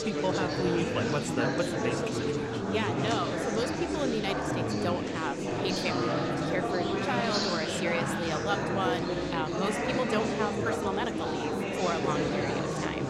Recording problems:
chatter from many people; very loud; throughout; 3 dB above the speech

